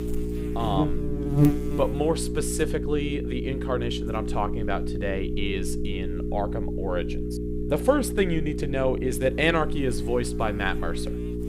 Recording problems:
electrical hum; loud; throughout; 60 Hz, 6 dB below the speech

